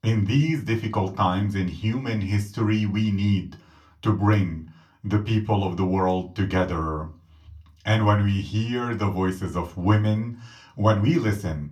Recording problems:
room echo; very slight; dies away in 0.2 s
off-mic speech; somewhat distant

